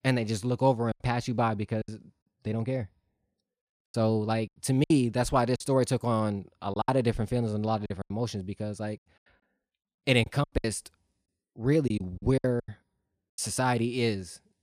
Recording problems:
choppy; very; 9% of the speech affected

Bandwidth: 15 kHz